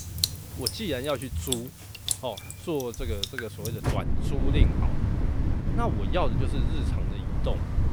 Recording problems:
rain or running water; very loud; throughout; 5 dB above the speech

